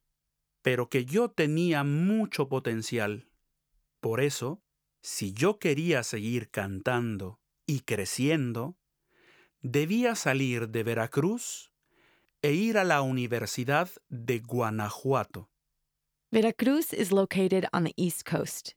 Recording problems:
none

